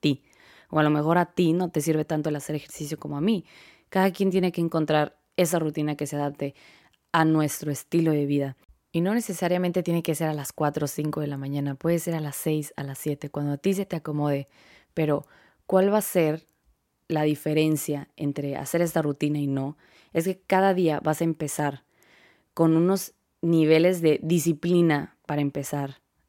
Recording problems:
none

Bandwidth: 16.5 kHz